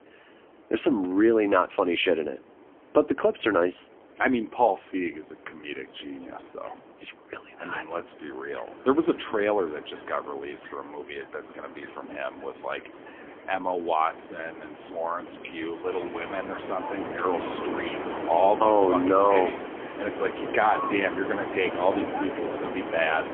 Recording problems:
phone-call audio; poor line; nothing above 3.5 kHz
wind in the background; loud; throughout; 9 dB below the speech

